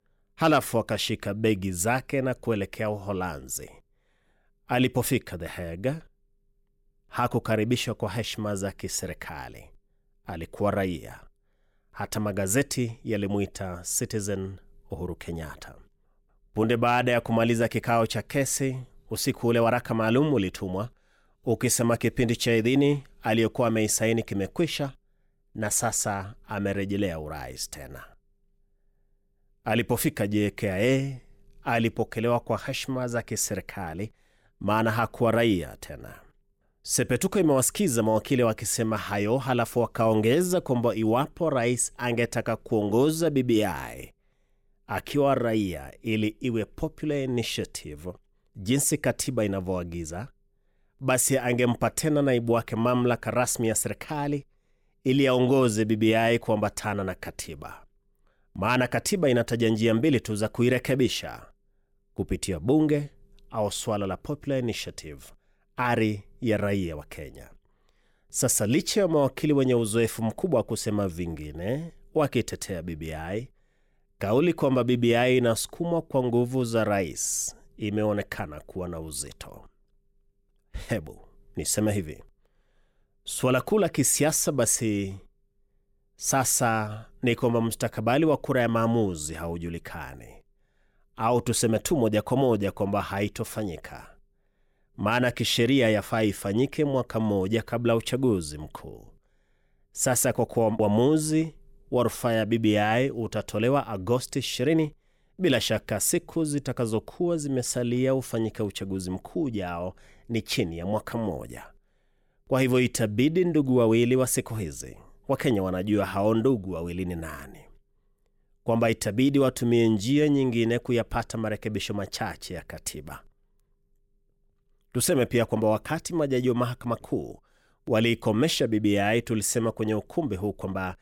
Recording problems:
none

